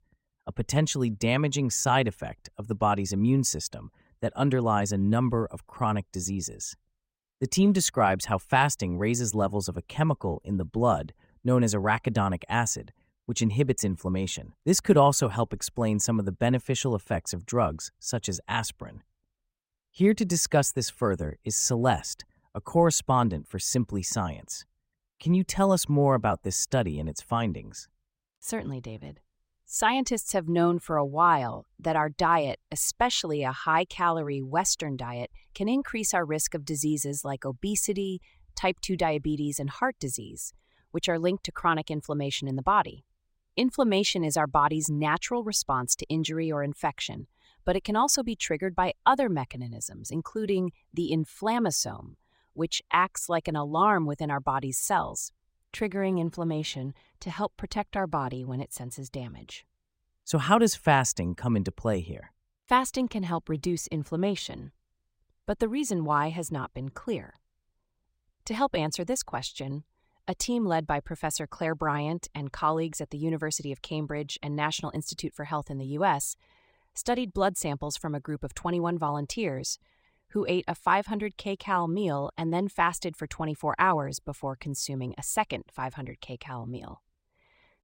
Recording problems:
none

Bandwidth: 16 kHz